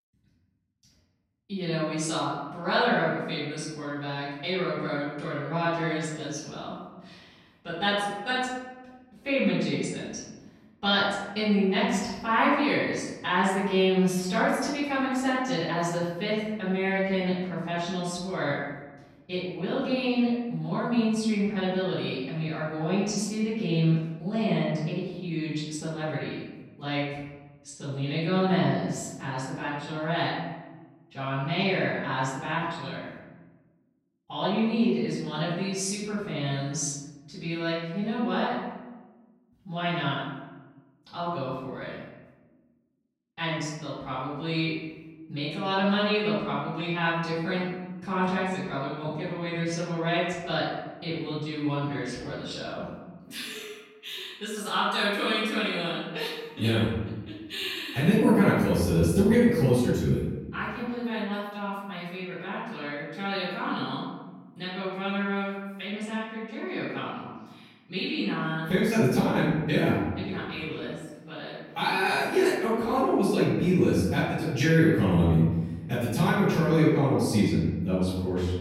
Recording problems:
off-mic speech; far
room echo; noticeable; dies away in 1.2 s

